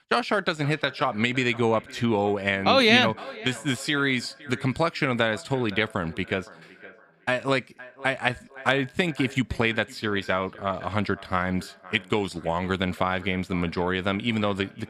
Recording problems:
echo of what is said; faint; throughout; 510 ms later, 20 dB below the speech

